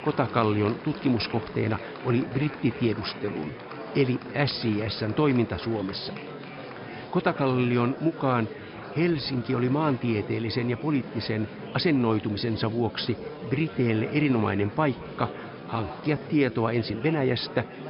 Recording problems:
high frequencies cut off; noticeable; nothing above 5.5 kHz
murmuring crowd; noticeable; throughout; 10 dB below the speech
uneven, jittery; strongly; from 1.5 to 17 s

